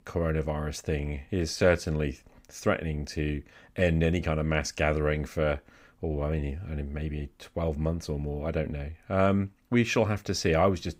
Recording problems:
none

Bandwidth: 15.5 kHz